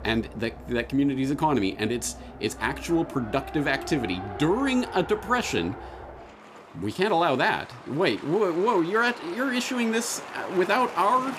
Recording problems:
traffic noise; noticeable; throughout; 15 dB below the speech

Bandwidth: 14.5 kHz